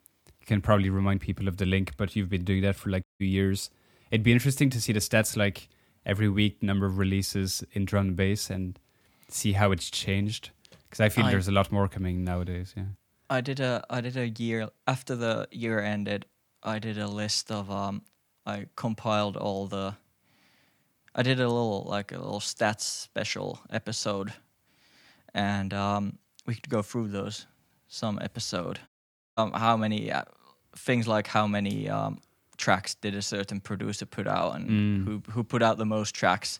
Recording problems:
audio cutting out; at 3 s and at 29 s

